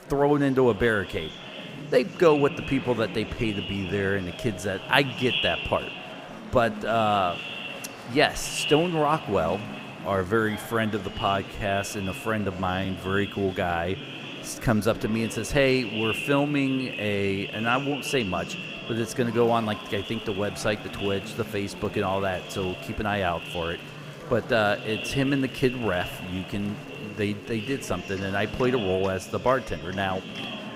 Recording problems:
echo of what is said; strong; throughout; 120 ms later, 10 dB below the speech
murmuring crowd; noticeable; throughout; 15 dB below the speech
uneven, jittery; slightly; from 2 to 24 s

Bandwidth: 15.5 kHz